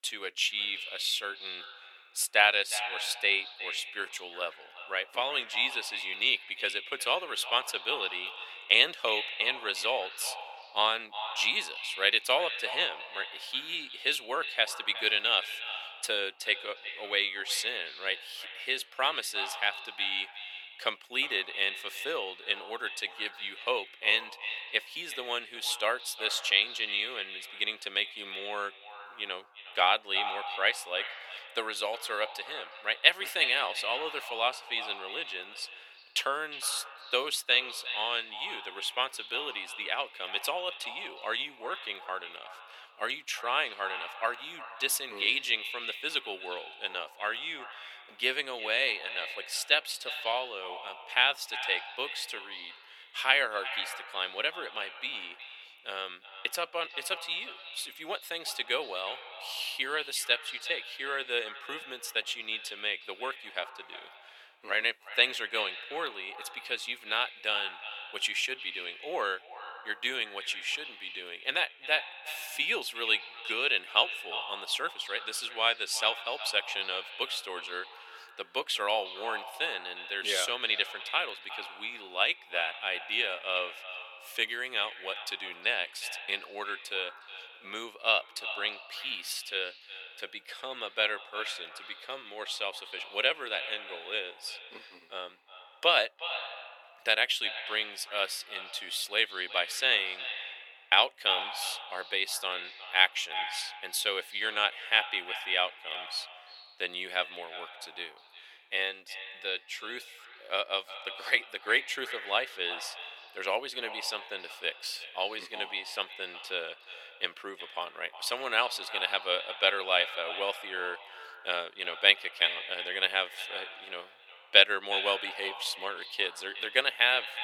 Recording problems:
echo of what is said; strong; throughout; 360 ms later, 10 dB below the speech
thin; very; fading below 550 Hz

